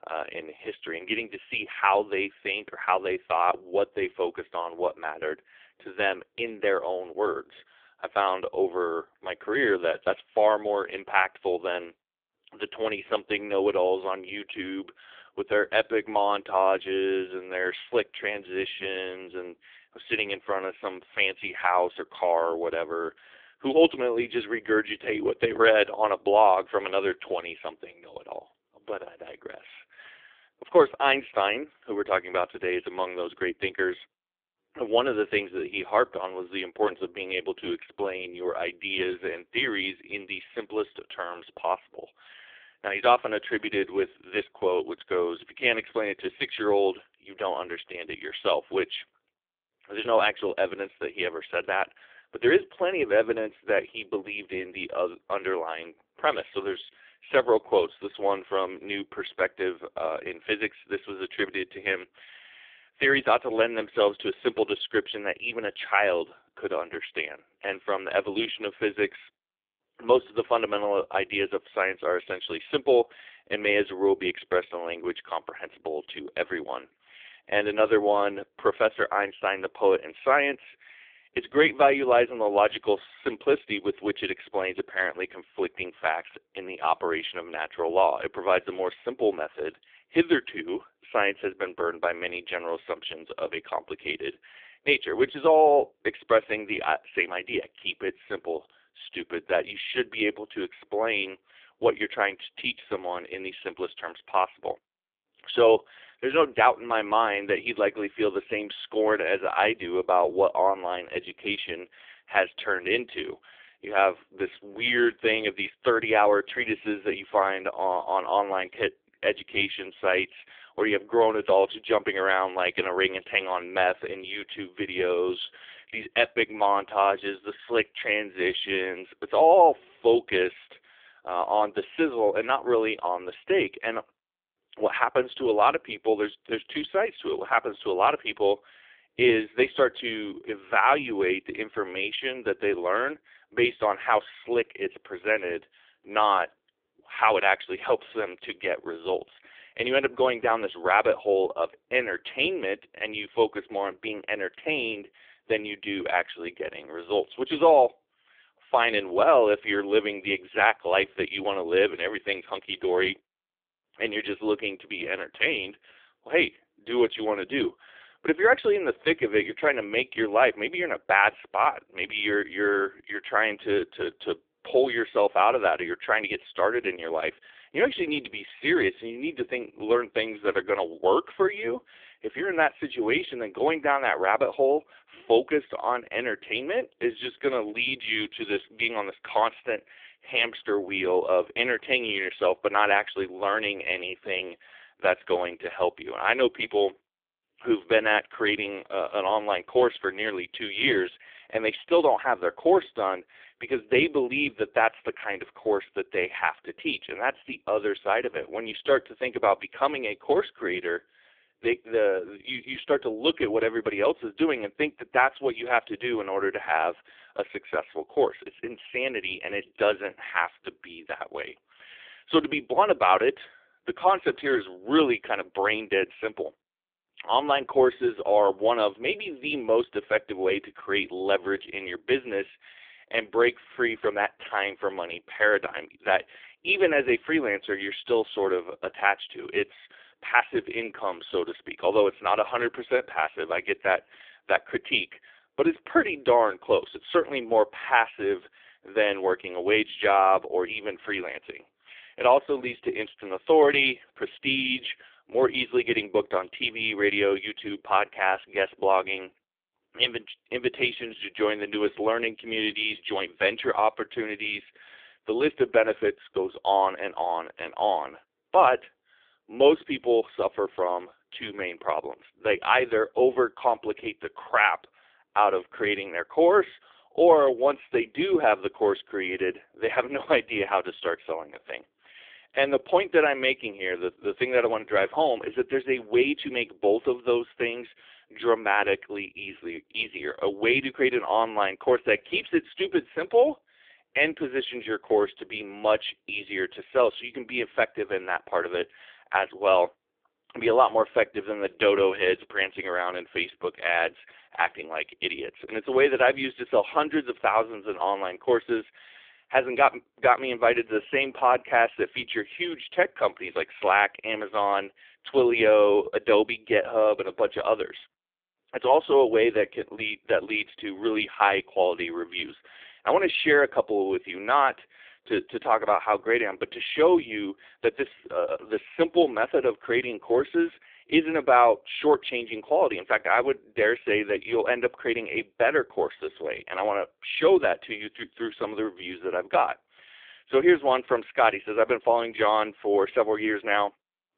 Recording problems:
phone-call audio; poor line; nothing above 3.5 kHz

